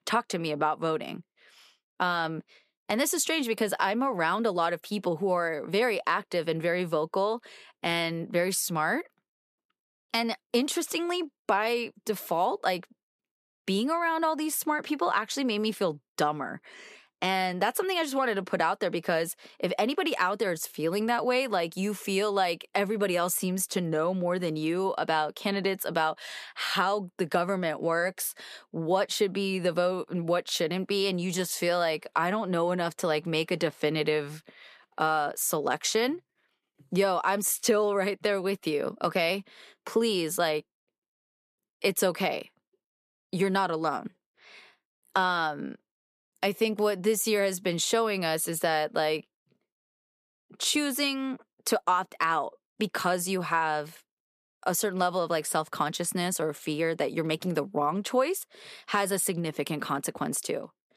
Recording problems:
none

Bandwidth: 14.5 kHz